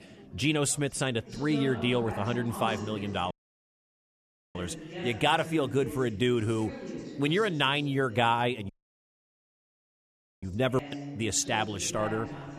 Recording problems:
chatter from many people; noticeable; throughout; 10 dB below the speech
audio cutting out; at 3.5 s for 1 s and at 8.5 s for 1.5 s

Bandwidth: 13.5 kHz